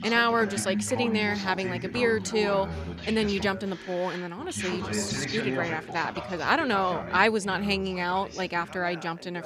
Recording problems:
background chatter; loud; throughout; 2 voices, 7 dB below the speech

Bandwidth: 14.5 kHz